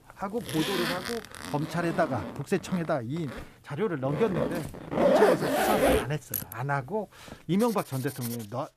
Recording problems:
household noises; very loud; throughout; 3 dB above the speech

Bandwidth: 14.5 kHz